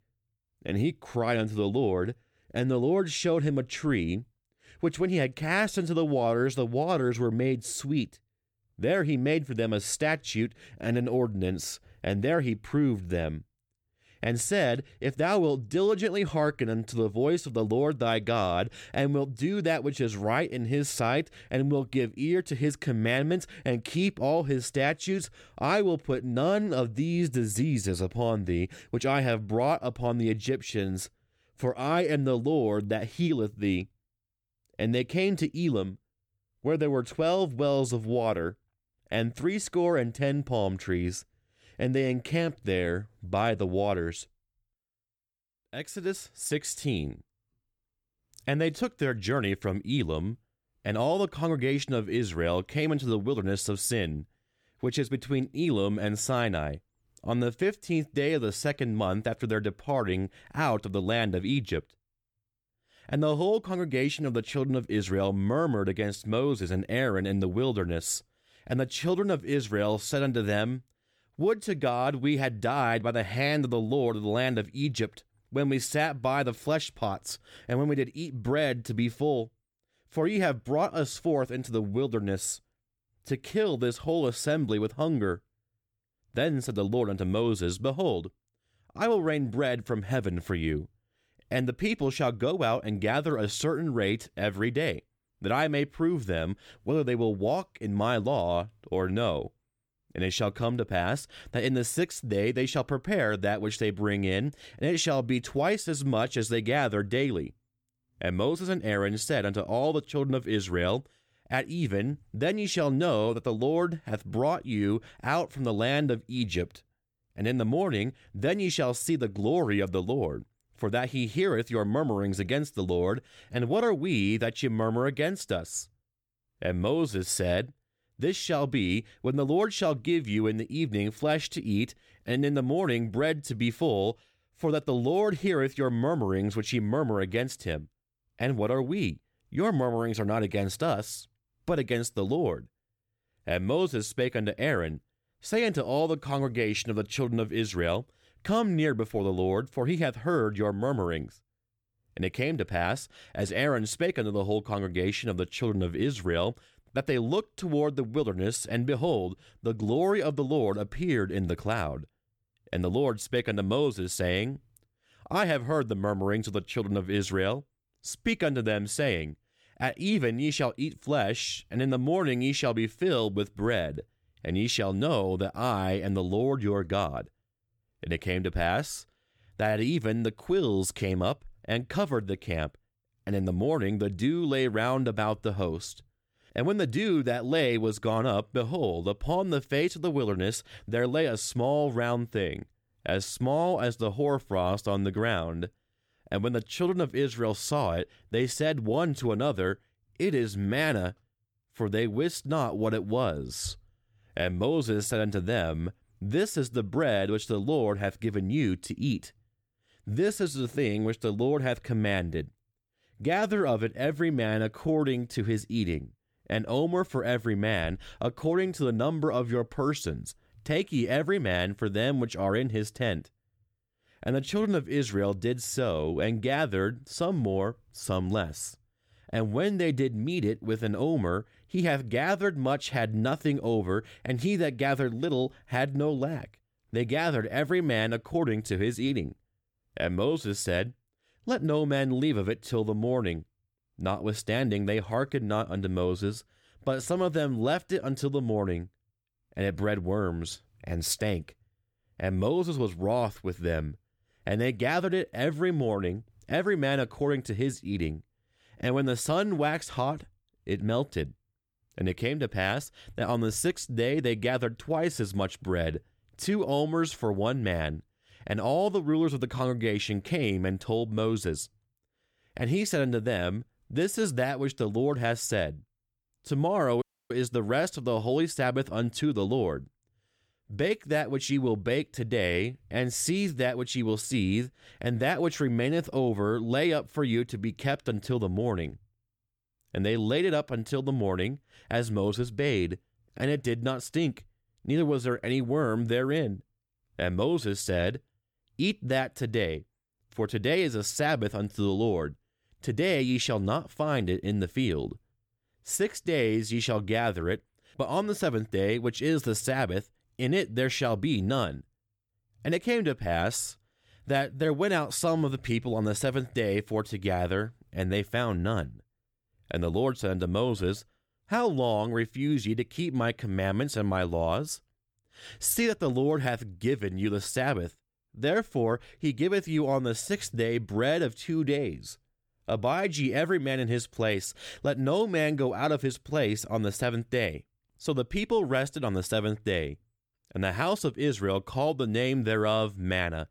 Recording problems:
audio cutting out; at 4:37

